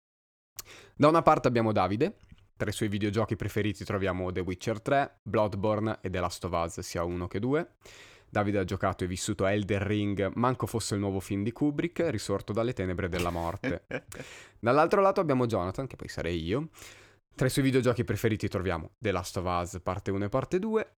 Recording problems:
none

